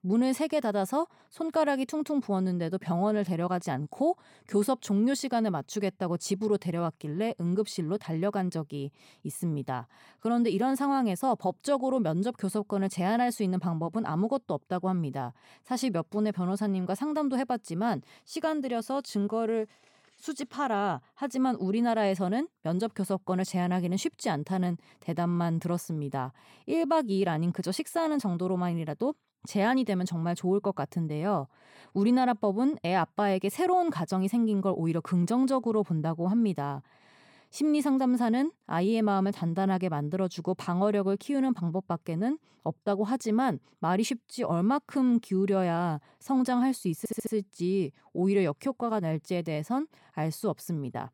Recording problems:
audio stuttering; at 47 s

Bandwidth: 17 kHz